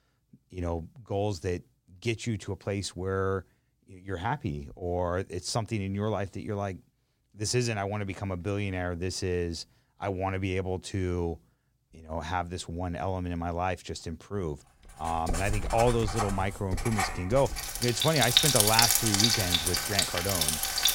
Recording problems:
household noises; very loud; from 15 s on; 5 dB above the speech

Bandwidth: 16.5 kHz